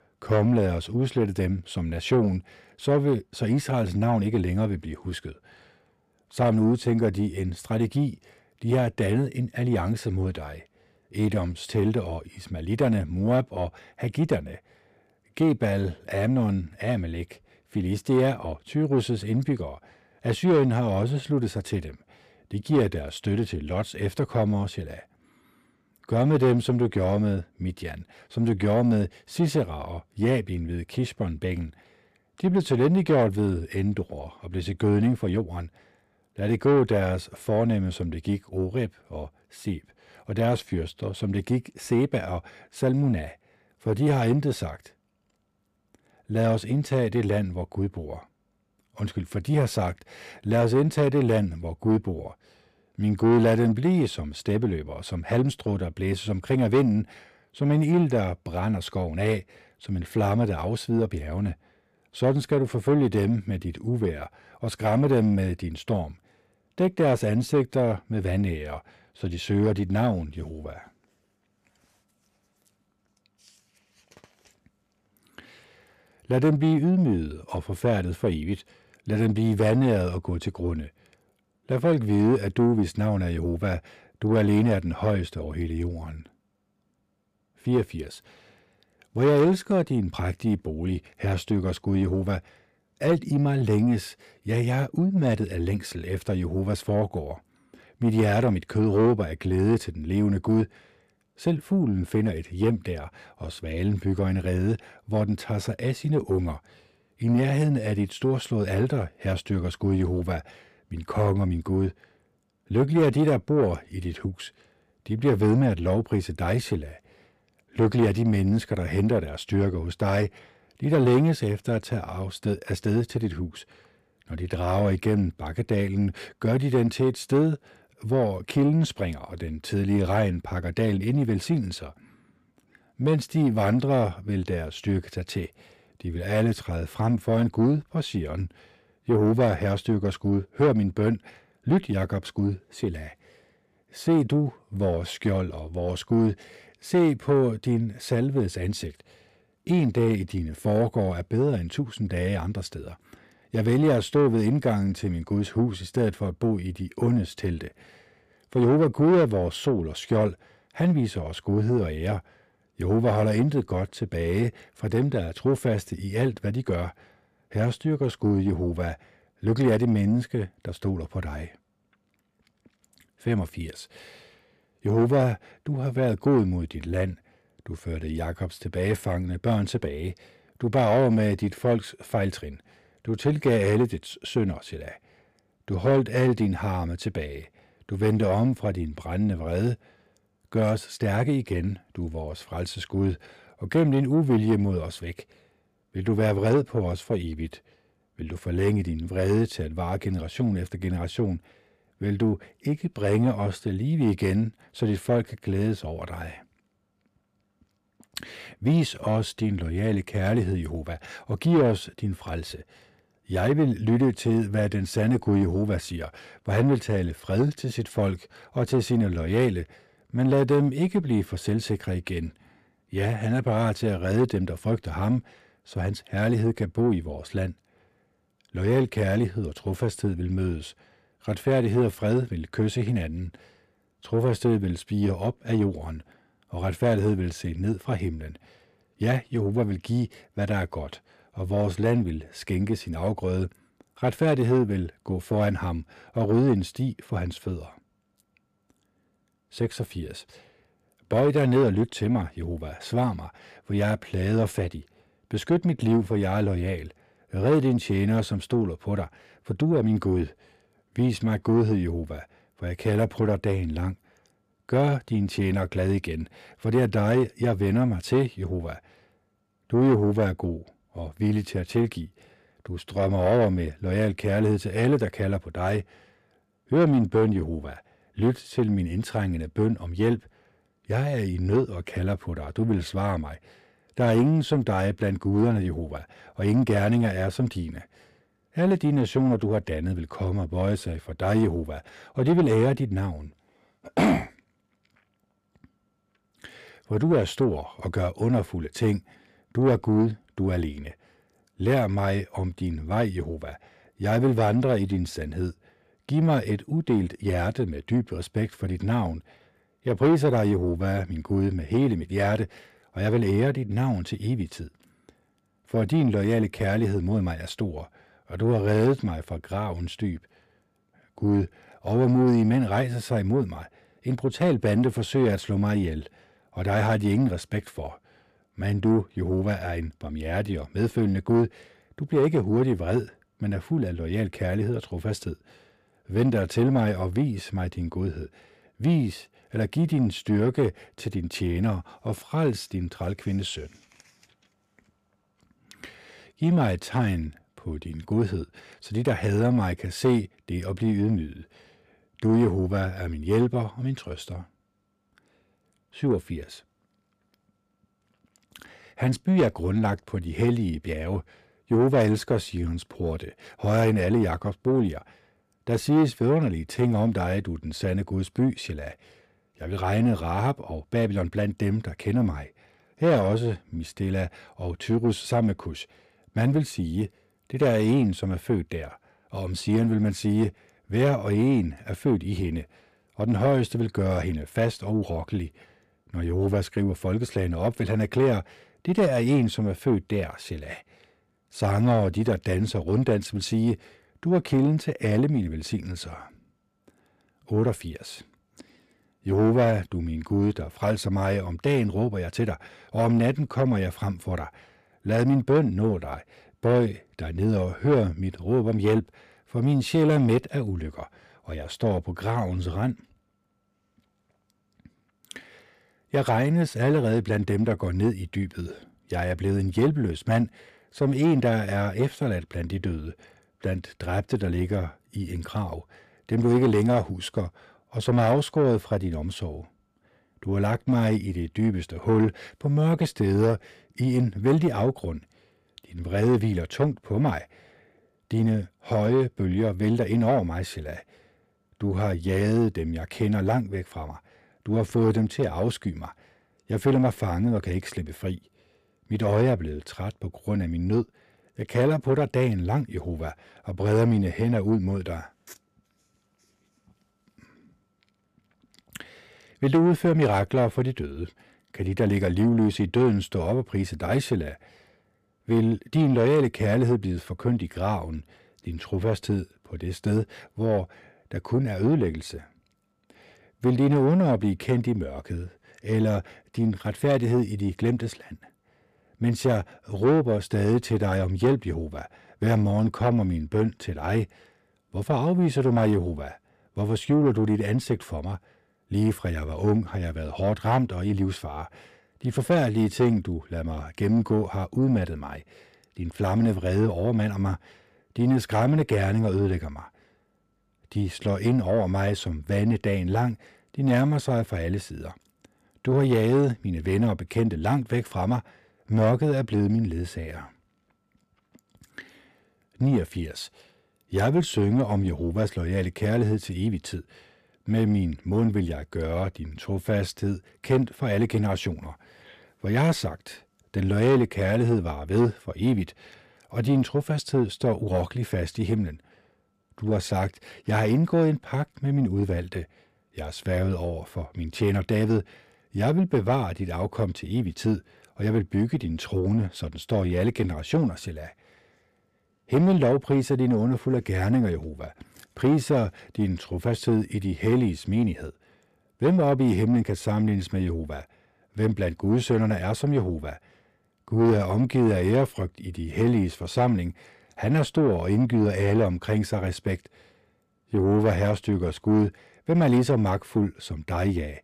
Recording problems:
distortion; slight; 10 dB below the speech

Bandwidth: 14.5 kHz